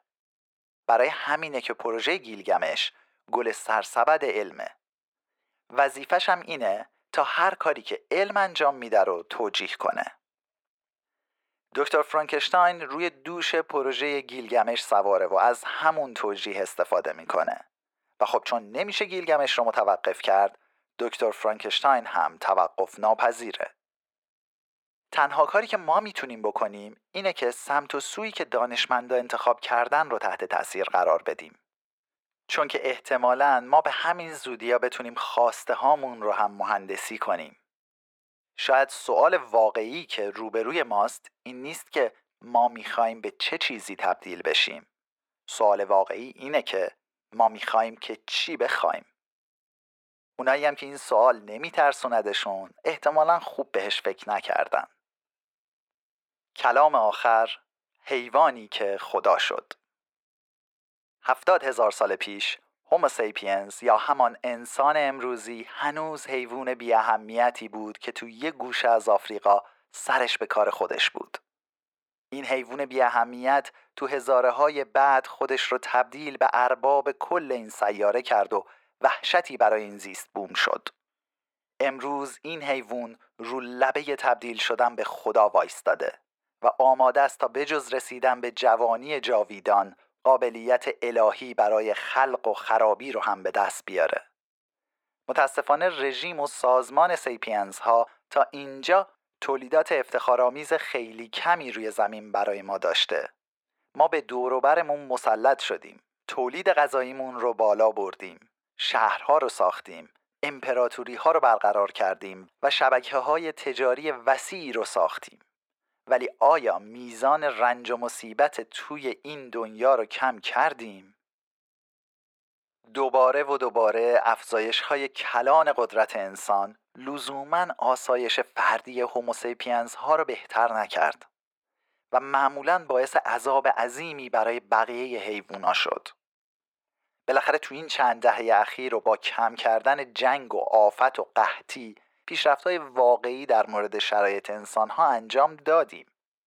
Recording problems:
thin; very; fading below 550 Hz
muffled; slightly; fading above 2 kHz

